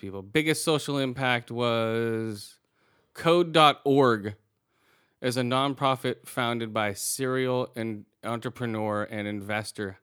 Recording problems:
none

